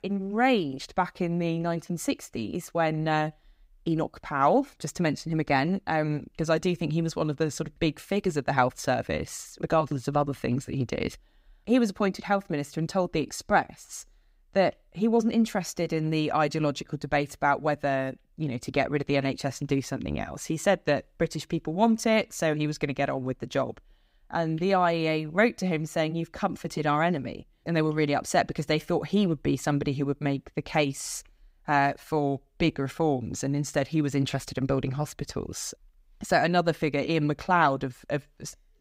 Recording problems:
none

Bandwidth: 15.5 kHz